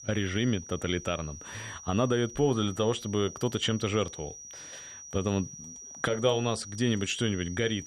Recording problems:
high-pitched whine; noticeable; throughout; 6 kHz, 15 dB below the speech

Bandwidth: 13.5 kHz